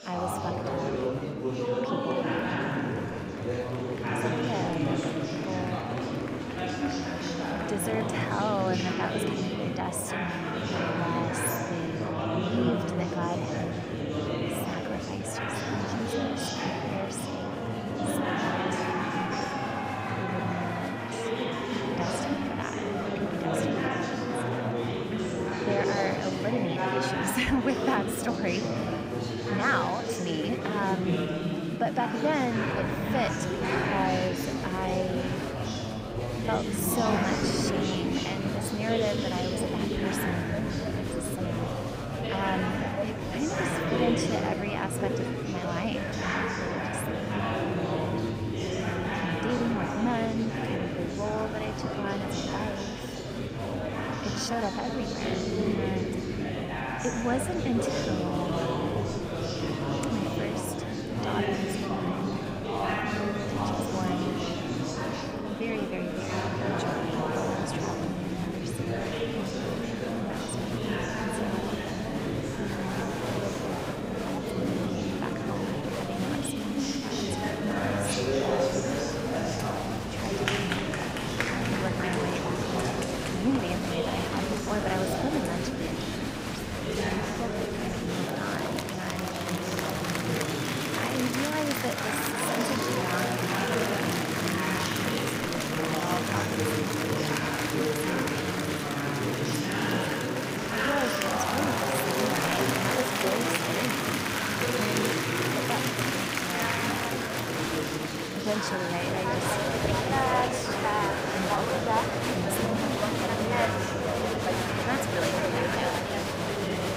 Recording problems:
murmuring crowd; very loud; throughout; 5 dB above the speech

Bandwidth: 15.5 kHz